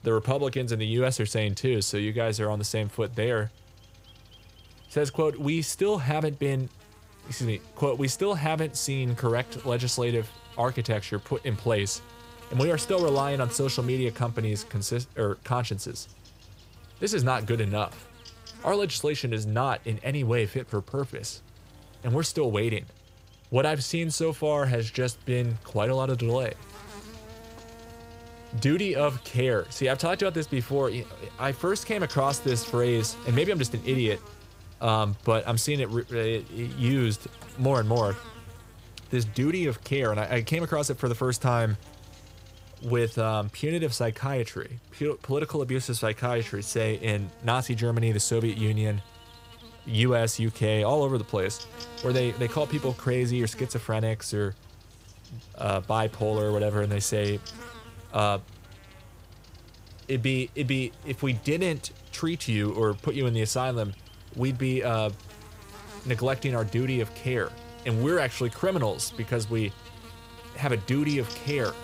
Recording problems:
electrical hum; noticeable; throughout; 50 Hz, 20 dB below the speech

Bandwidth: 15.5 kHz